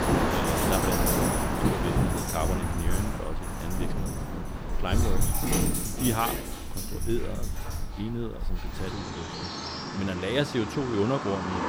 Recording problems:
animal sounds; very loud; throughout; as loud as the speech
rain or running water; very loud; throughout; 2 dB above the speech

